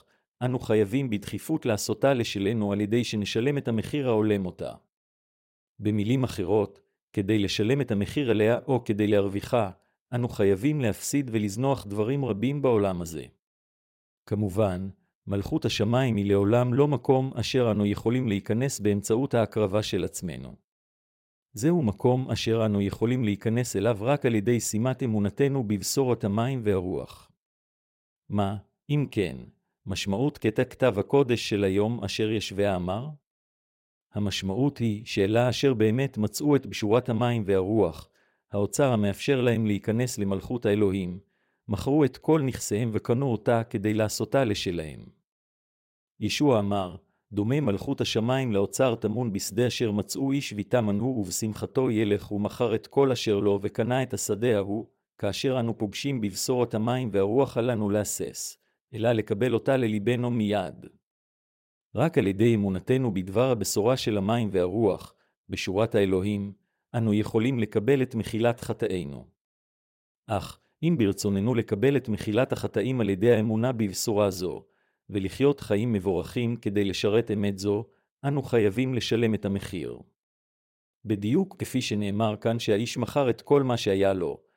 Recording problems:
none

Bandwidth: 16 kHz